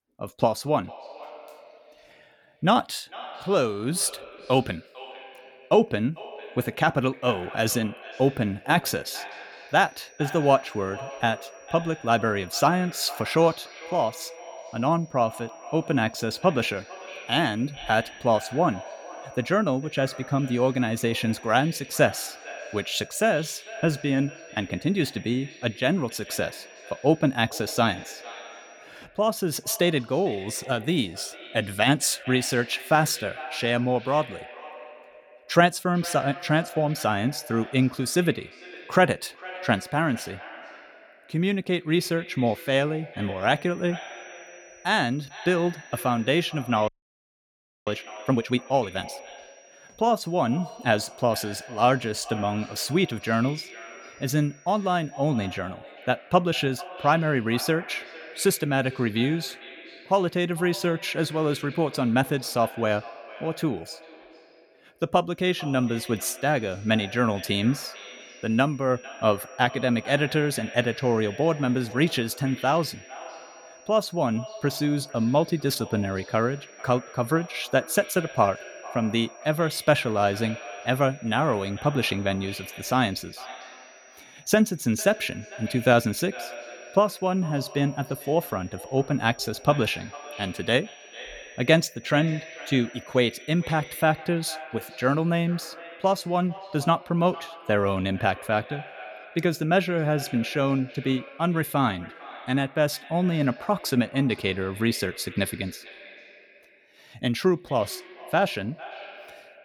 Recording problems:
echo of what is said; noticeable; throughout; 450 ms later, 15 dB below the speech
high-pitched whine; faint; from 9.5 to 29 s, from 44 to 56 s and from 1:05 to 1:34; 5.5 kHz, 30 dB below the speech
audio freezing; at 47 s for 1 s

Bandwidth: 18 kHz